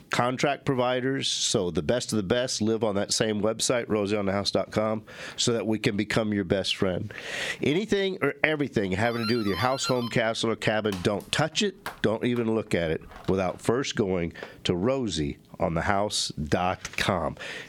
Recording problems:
squashed, flat; heavily
doorbell; noticeable; from 9 to 13 s; peak 6 dB below the speech

